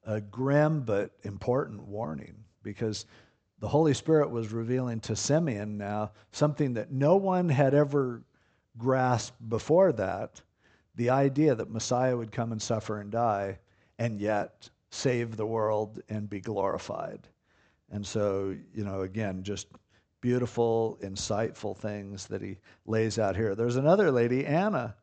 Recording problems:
high frequencies cut off; noticeable; nothing above 8 kHz

